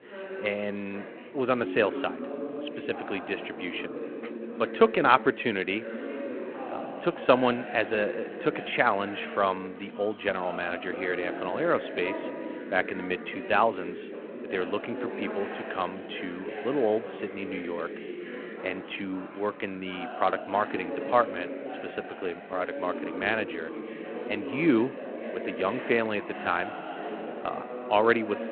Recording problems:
phone-call audio
chatter from many people; loud; throughout; 8 dB below the speech

